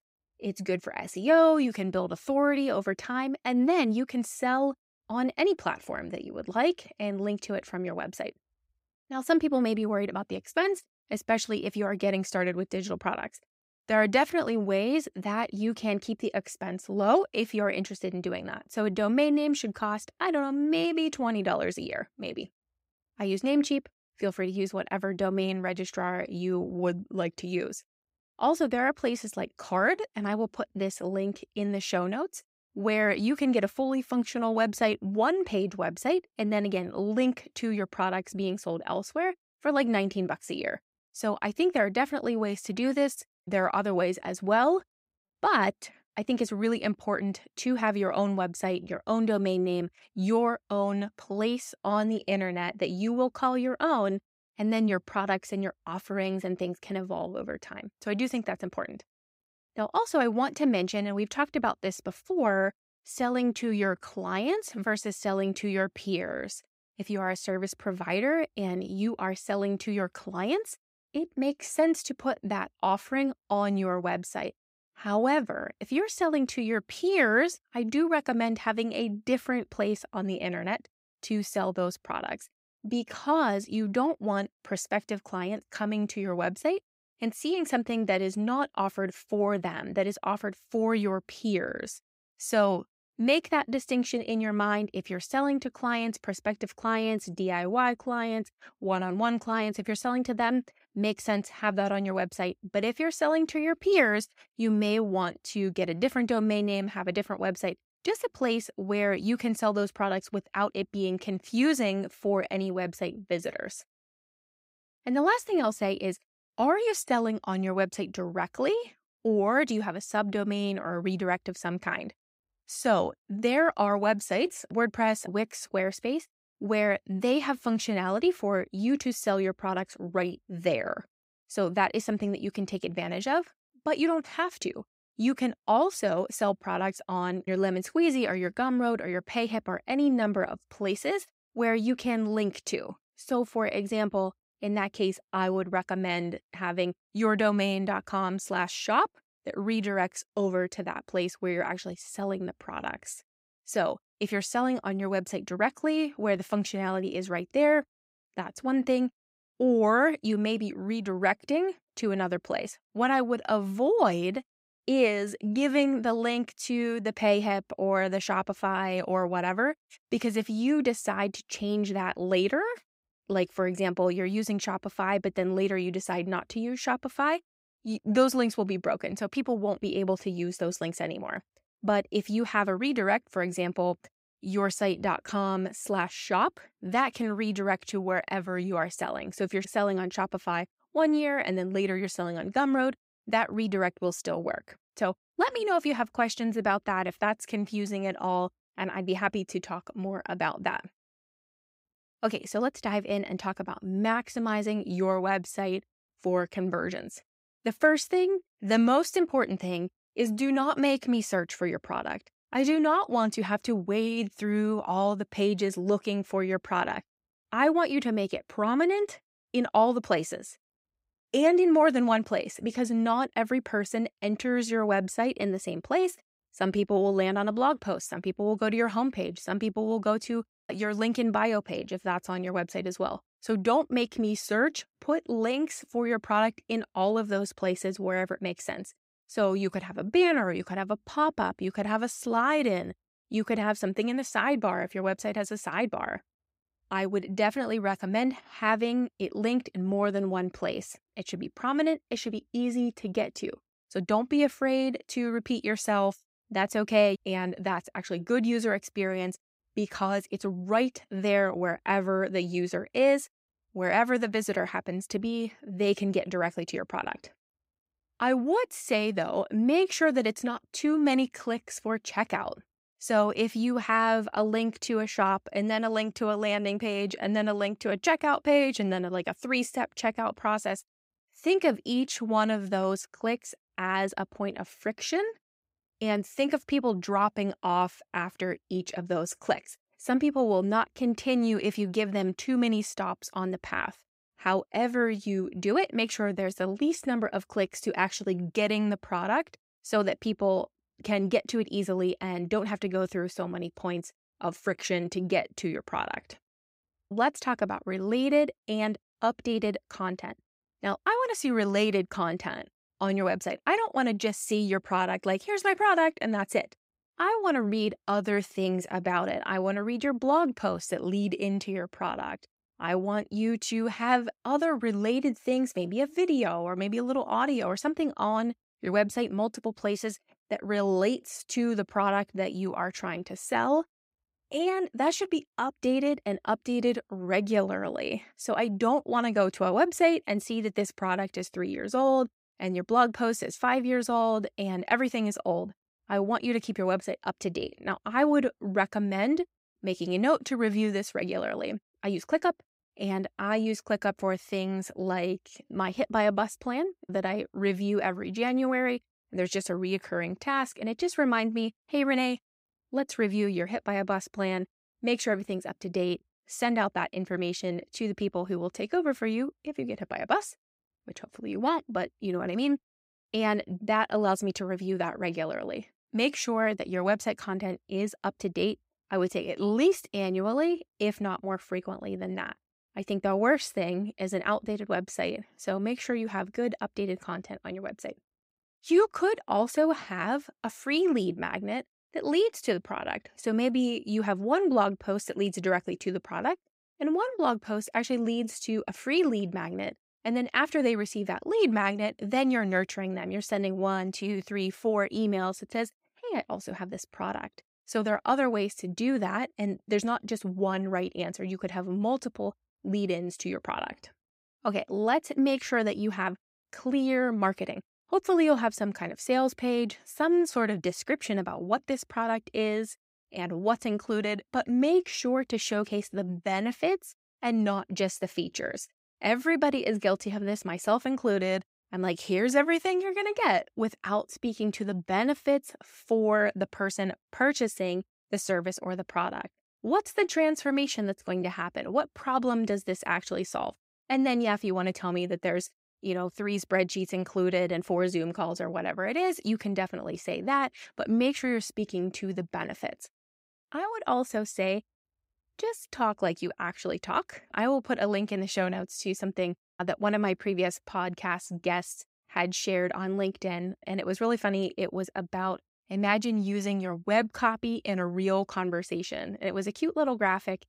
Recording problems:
none

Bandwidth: 15.5 kHz